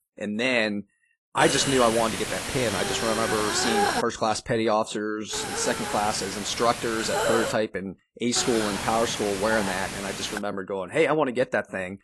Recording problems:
garbled, watery; slightly
hiss; loud; from 1.5 to 4 s, from 5.5 to 7.5 s and from 8.5 to 10 s; 3 dB below the speech

